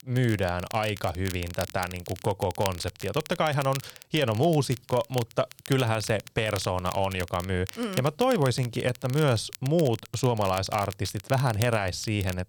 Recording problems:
crackle, like an old record; noticeable; 15 dB below the speech

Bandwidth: 18.5 kHz